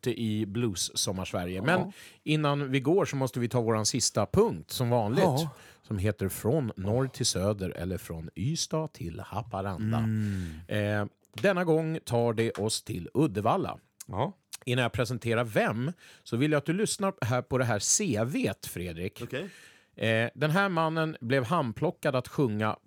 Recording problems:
none

